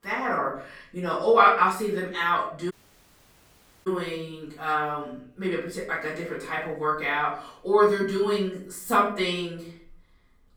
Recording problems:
off-mic speech; far
room echo; noticeable; dies away in 0.4 s
audio cutting out; at 2.5 s for 1 s

